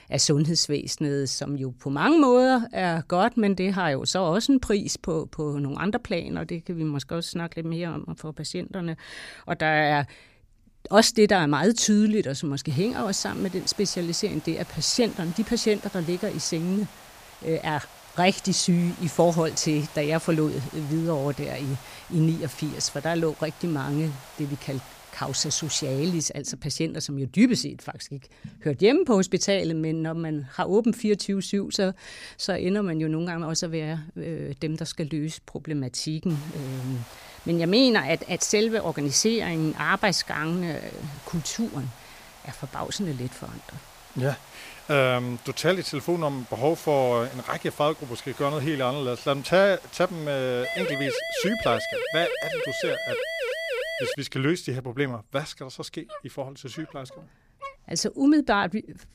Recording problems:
hiss; noticeable; from 13 to 26 s and from 36 to 51 s; 20 dB below the speech
siren; noticeable; from 51 to 54 s; peak 3 dB below the speech
dog barking; faint; from 56 to 58 s; peak 15 dB below the speech

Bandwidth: 15 kHz